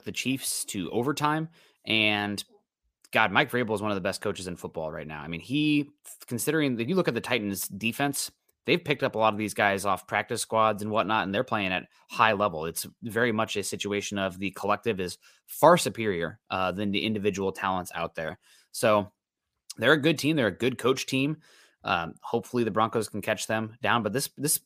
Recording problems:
none

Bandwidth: 15 kHz